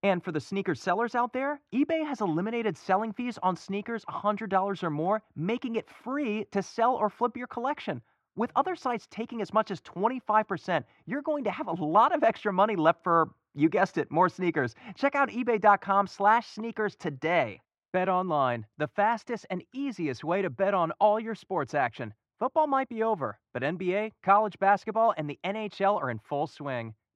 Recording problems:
muffled; very; fading above 2 kHz

